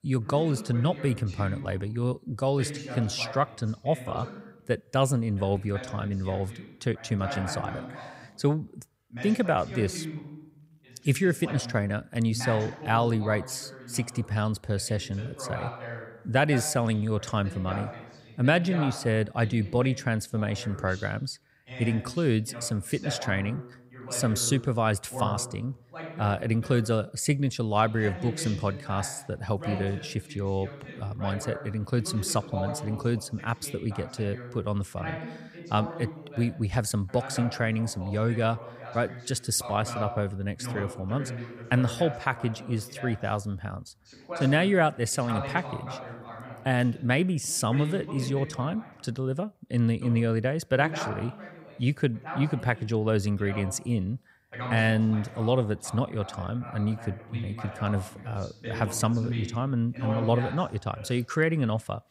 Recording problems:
voice in the background; noticeable; throughout; 10 dB below the speech

